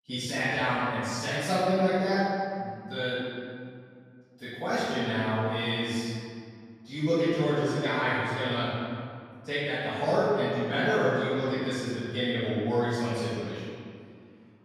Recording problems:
room echo; strong; dies away in 2.1 s
off-mic speech; far

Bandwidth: 14.5 kHz